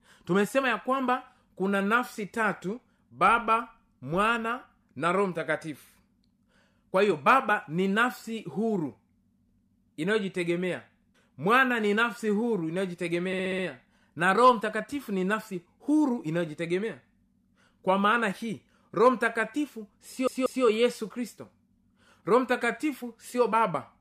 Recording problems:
audio stuttering; at 13 s and at 20 s

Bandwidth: 15 kHz